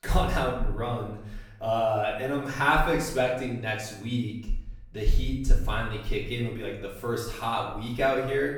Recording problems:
off-mic speech; far
room echo; noticeable; dies away in 0.7 s

